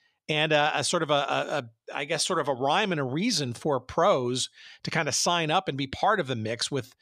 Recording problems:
none

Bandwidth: 14.5 kHz